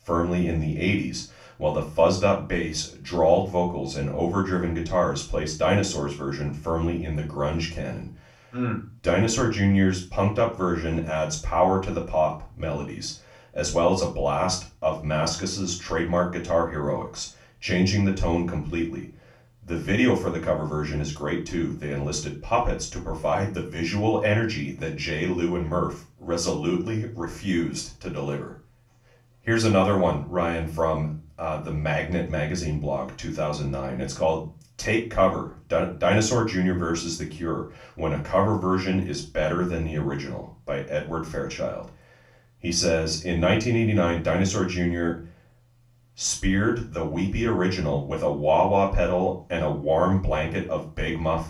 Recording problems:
off-mic speech; far
room echo; slight; dies away in 0.3 s

